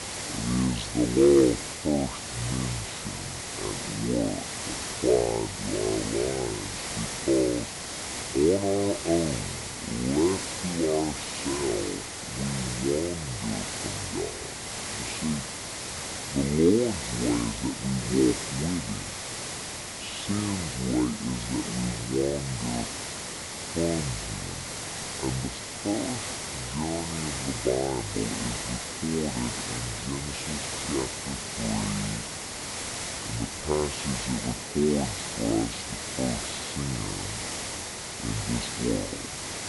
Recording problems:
wrong speed and pitch; too slow and too low; 0.6 times normal speed
high frequencies cut off; noticeable; nothing above 7.5 kHz
hiss; loud; throughout; 4 dB below the speech

